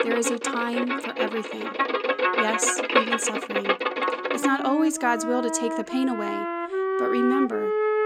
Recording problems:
background music; very loud; throughout; 1 dB above the speech

